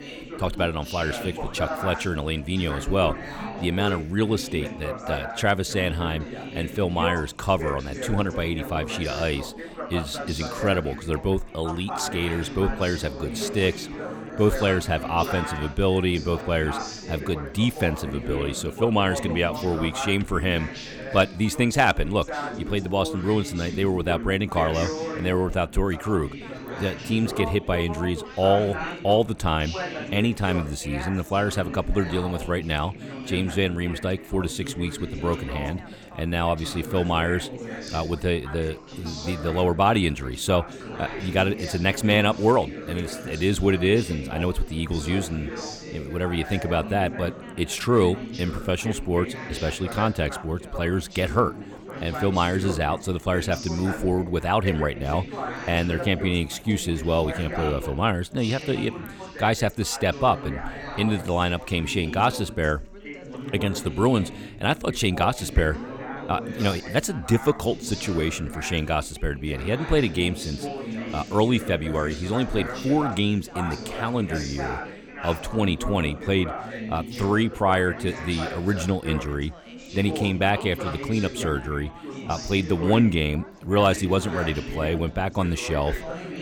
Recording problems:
background chatter; loud; throughout; 4 voices, 10 dB below the speech

